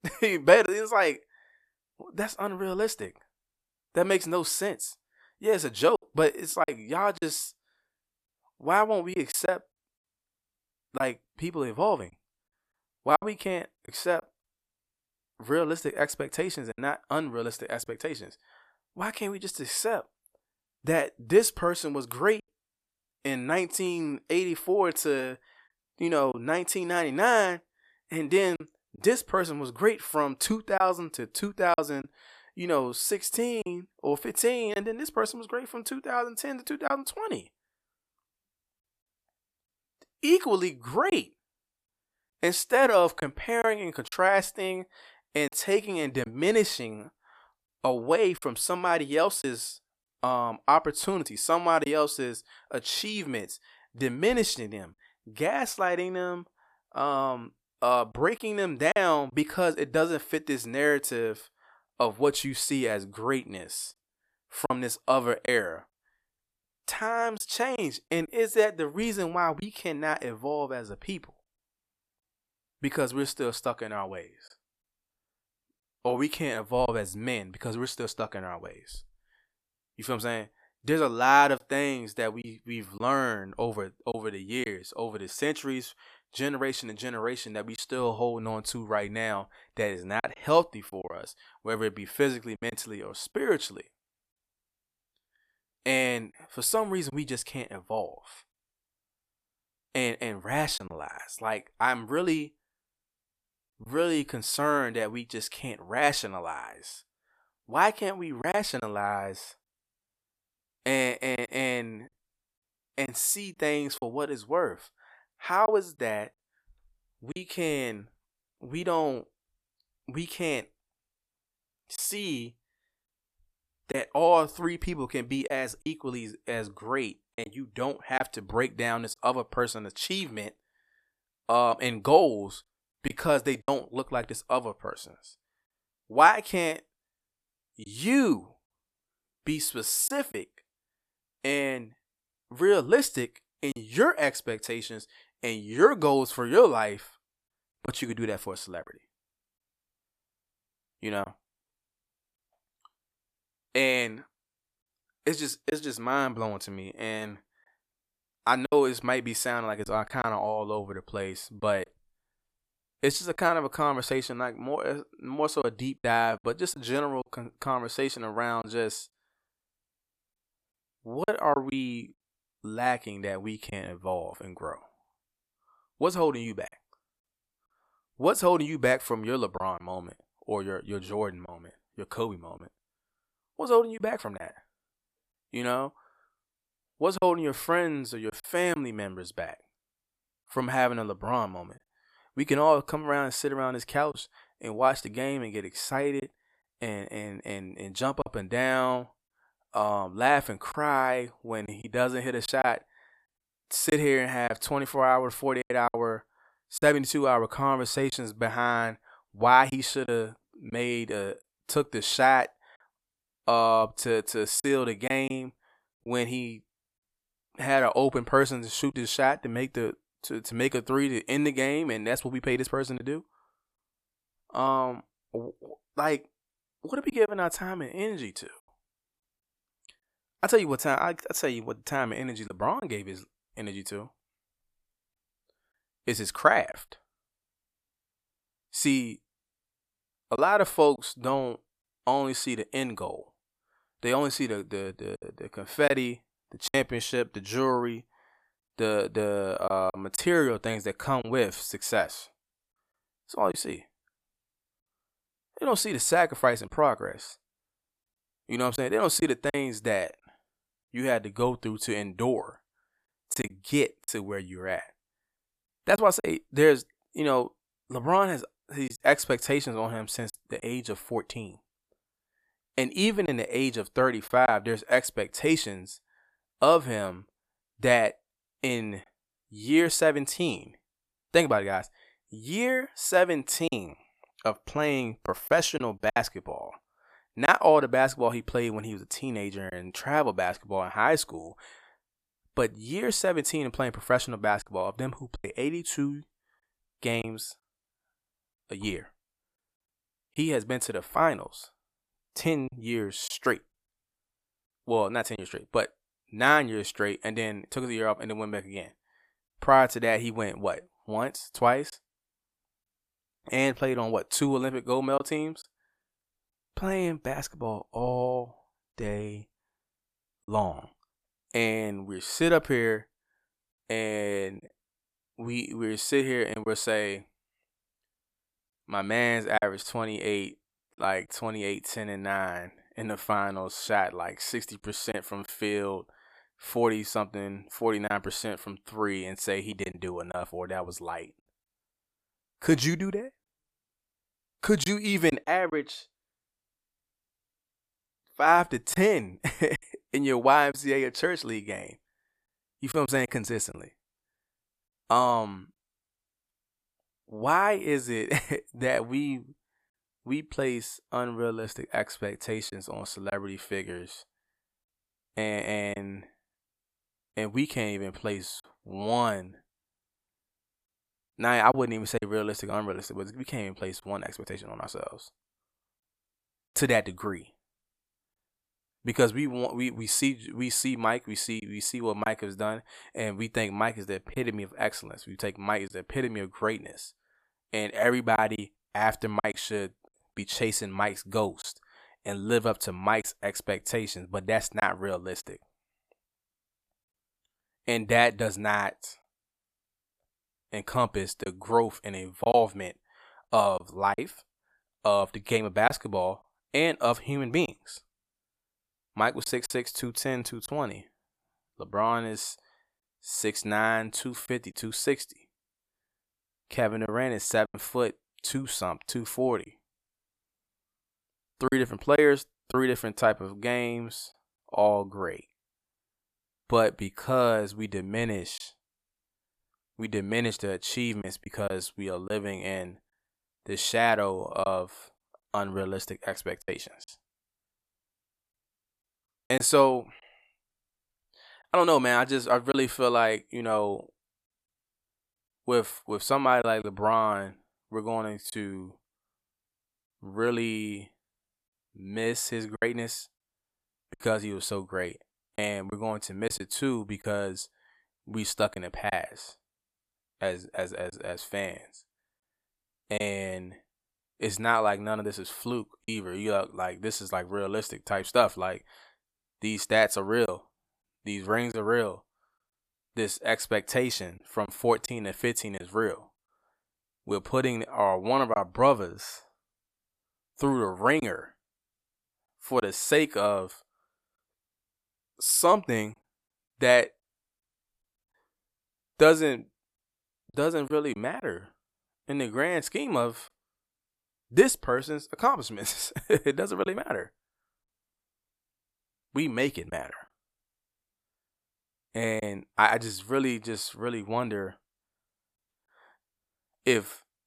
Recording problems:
choppy; occasionally; 2% of the speech affected

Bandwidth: 14.5 kHz